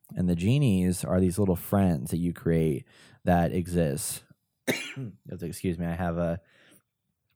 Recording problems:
none

